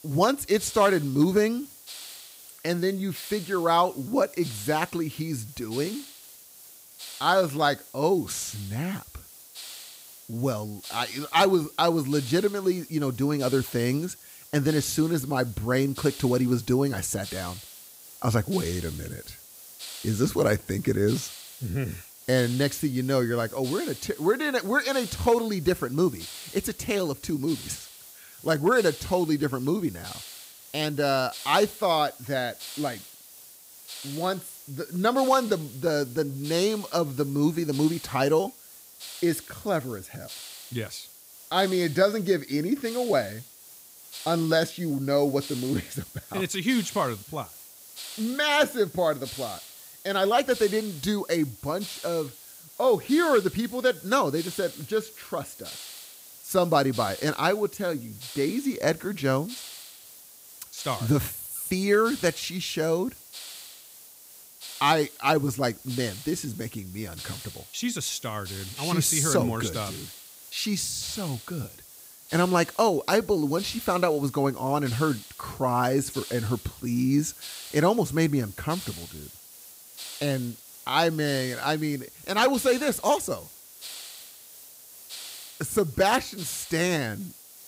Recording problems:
hiss; noticeable; throughout; 15 dB below the speech

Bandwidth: 15.5 kHz